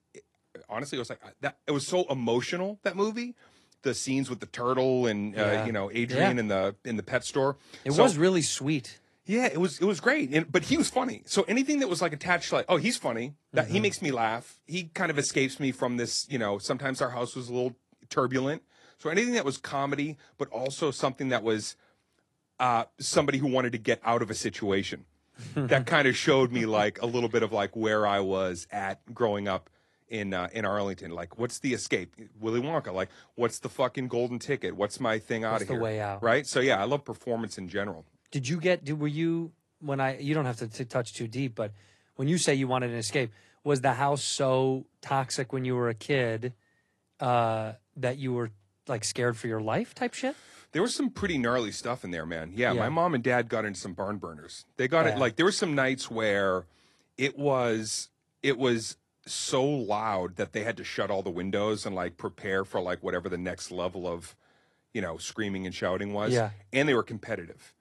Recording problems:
garbled, watery; slightly

